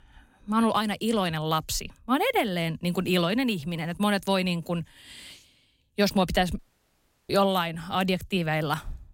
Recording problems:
audio cutting out; at 6.5 s for 0.5 s

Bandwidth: 16 kHz